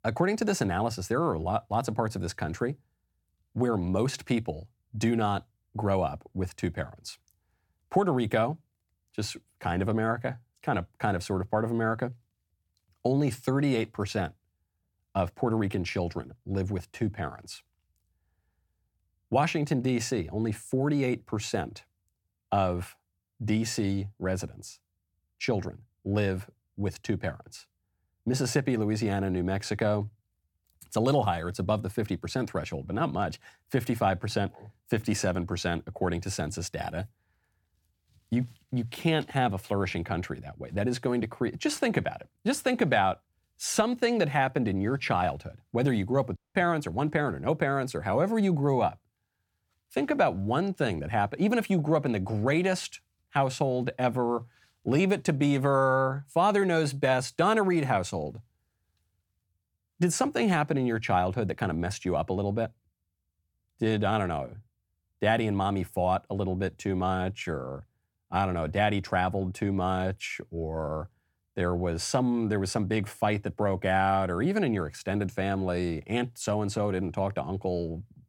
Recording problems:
audio cutting out; at 46 s

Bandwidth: 17.5 kHz